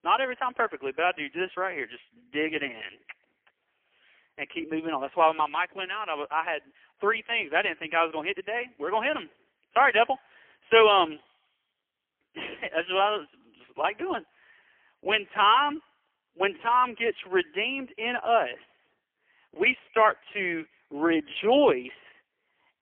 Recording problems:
phone-call audio; poor line; nothing above 3.5 kHz

